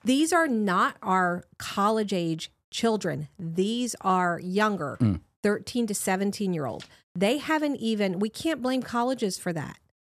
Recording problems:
none

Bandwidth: 14 kHz